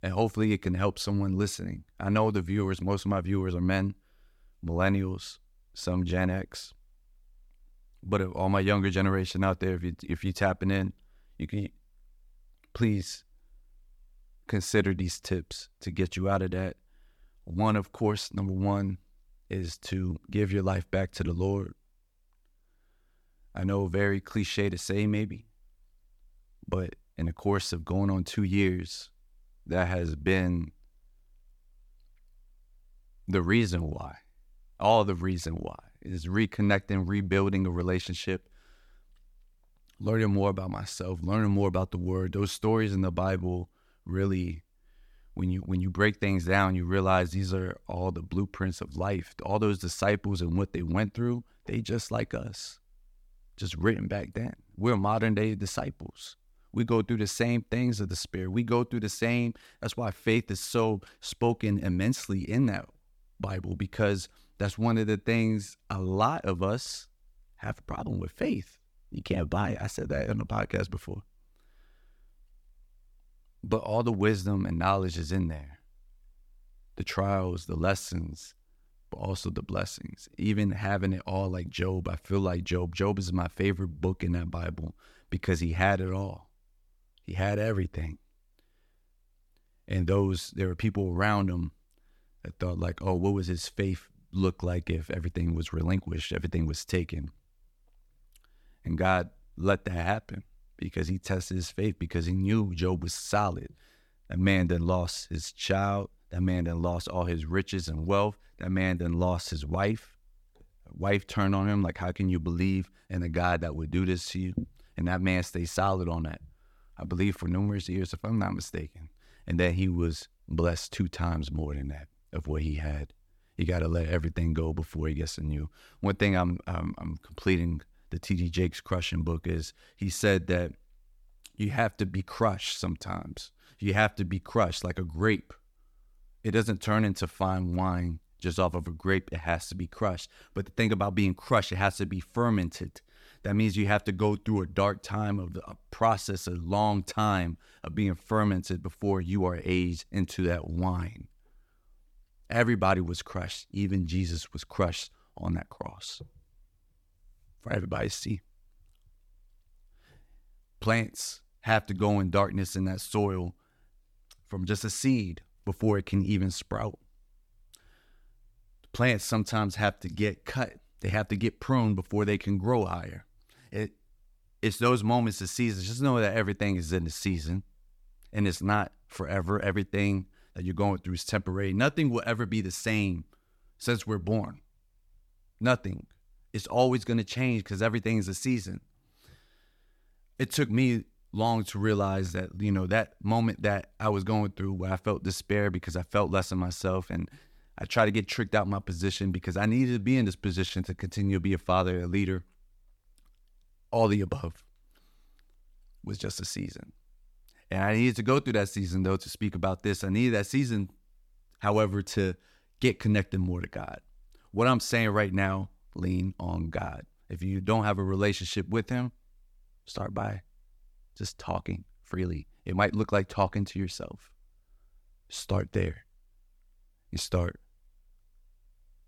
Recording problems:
none

